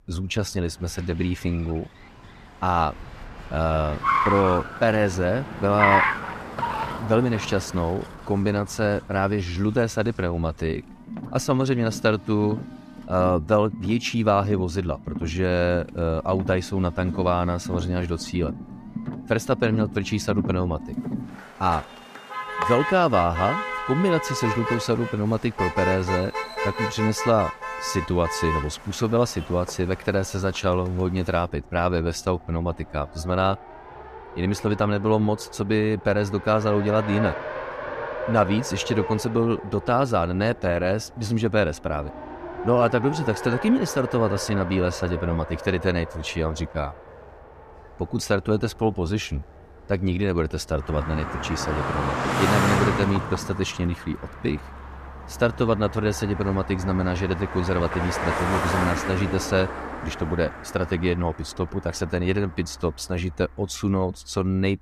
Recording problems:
traffic noise; loud; throughout; 6 dB below the speech

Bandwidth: 14.5 kHz